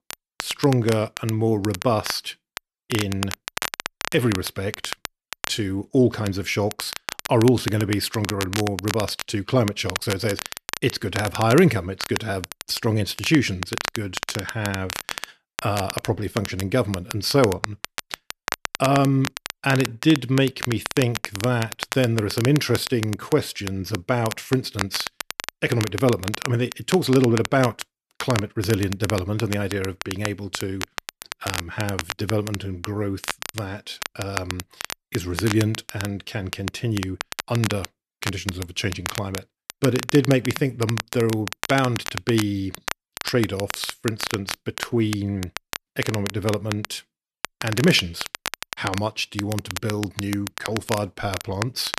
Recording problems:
crackle, like an old record; loud; 8 dB below the speech

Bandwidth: 13.5 kHz